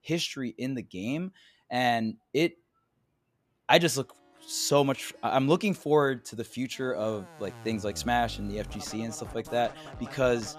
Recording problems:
background music; noticeable; from 4.5 s on; 15 dB below the speech

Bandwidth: 14.5 kHz